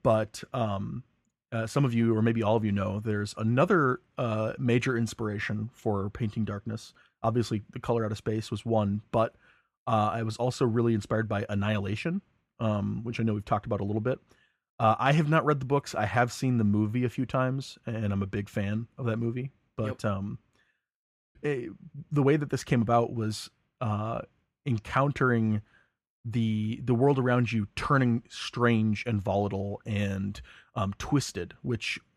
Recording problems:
none

